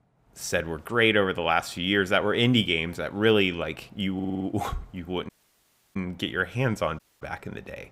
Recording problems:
audio stuttering; at 4 s
audio cutting out; at 5.5 s for 0.5 s and at 7 s

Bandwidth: 15.5 kHz